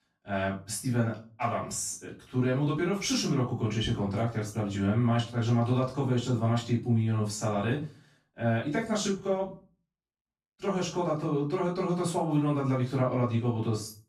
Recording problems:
off-mic speech; far
room echo; slight; dies away in 0.3 s

